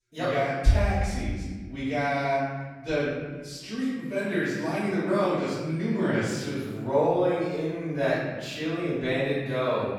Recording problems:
room echo; strong; dies away in 1.4 s
off-mic speech; far

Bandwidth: 17 kHz